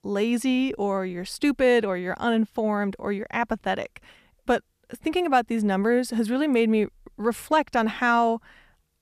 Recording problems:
none

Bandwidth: 14.5 kHz